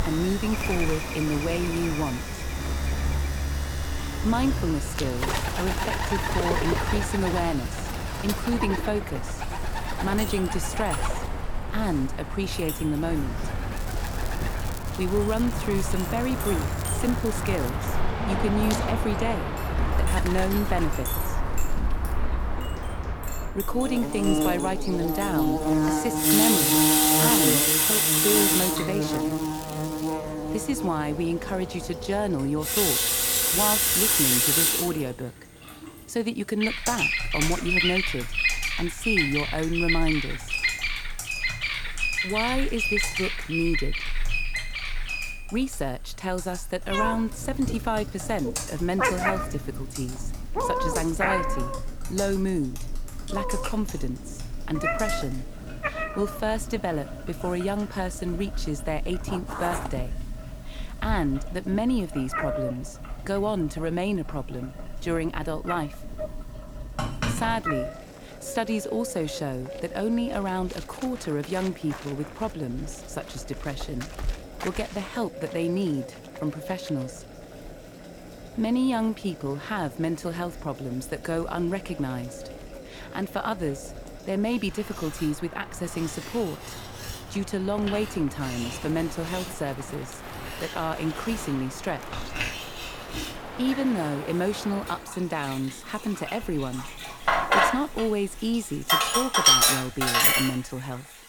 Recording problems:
household noises; very loud; throughout; 4 dB above the speech
animal sounds; loud; throughout; 1 dB below the speech
crackling; noticeable; from 14 to 18 s and from 28 to 30 s; 15 dB below the speech
alarms or sirens; faint; throughout; 25 dB below the speech

